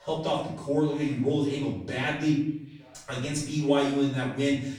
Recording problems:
off-mic speech; far
room echo; noticeable; dies away in 0.7 s
background chatter; faint; throughout; 2 voices, 30 dB below the speech

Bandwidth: 18.5 kHz